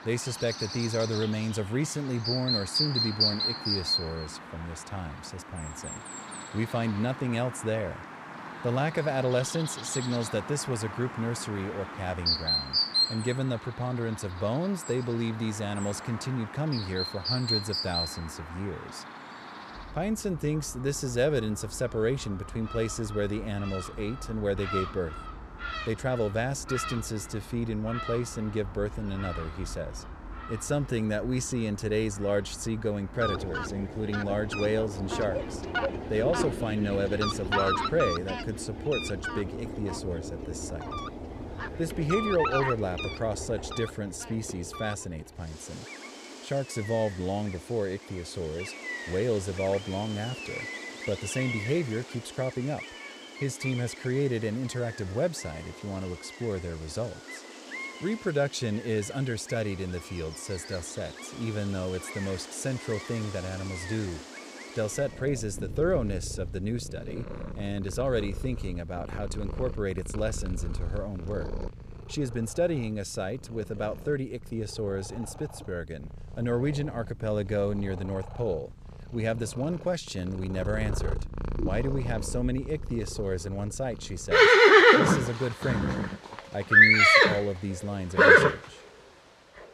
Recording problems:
animal sounds; very loud; throughout; 4 dB above the speech

